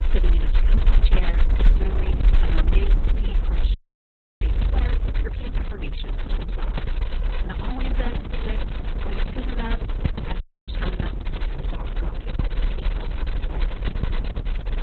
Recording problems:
garbled, watery; badly; nothing above 4 kHz
low rumble; very loud; throughout; 5 dB above the speech
audio freezing; at 3.5 s for 0.5 s and at 10 s

